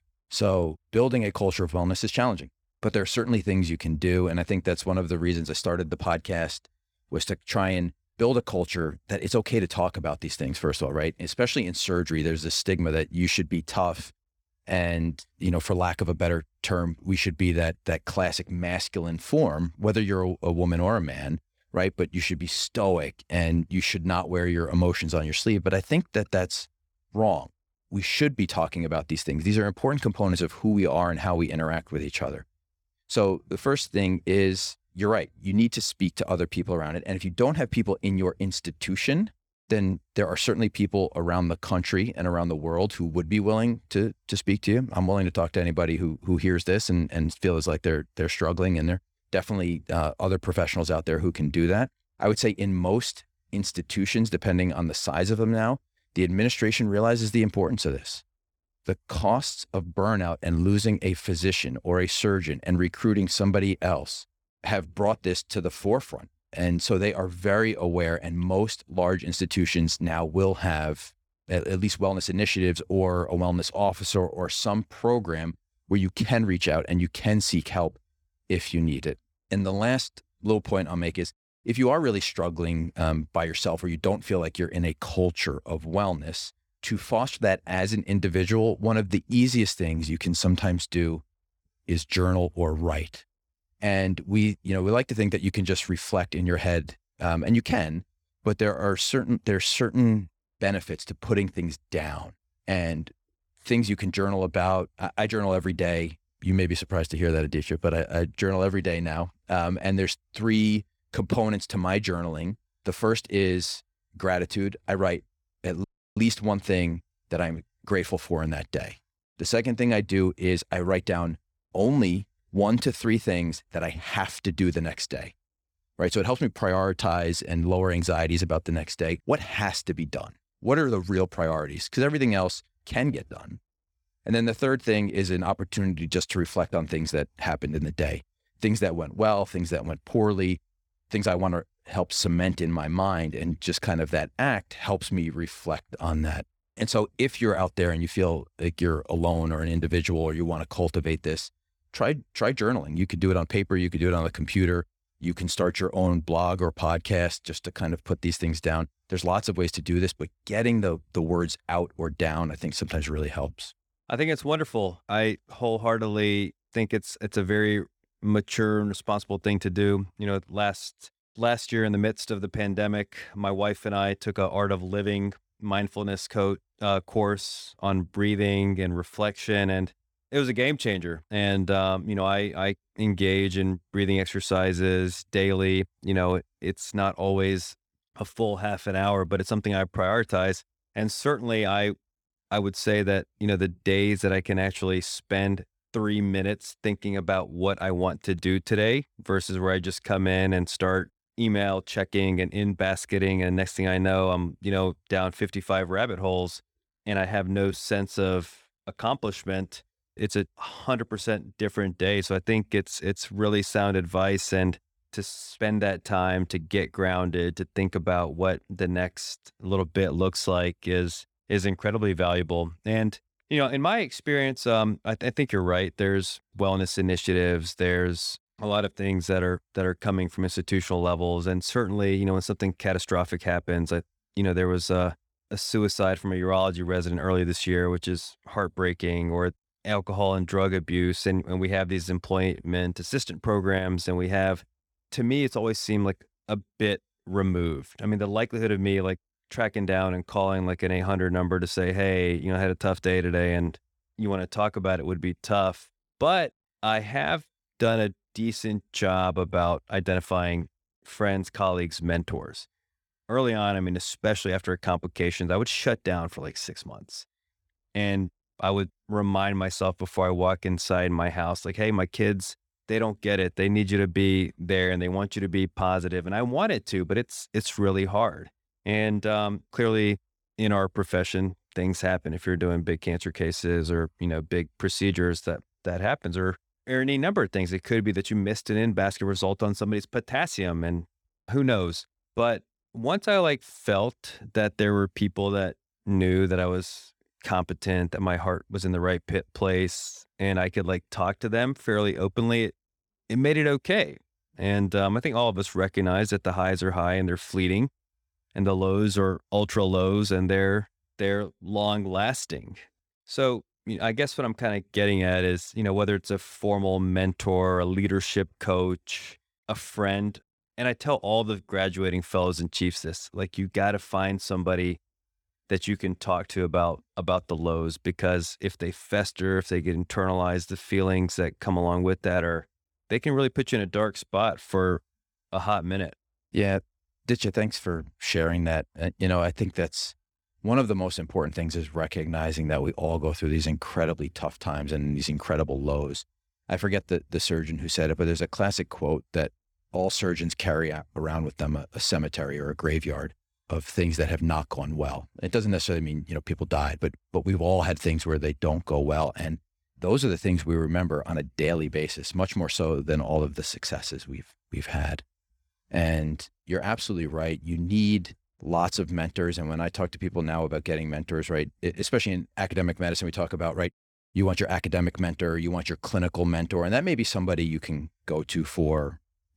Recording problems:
audio cutting out; at 1:56

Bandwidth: 18.5 kHz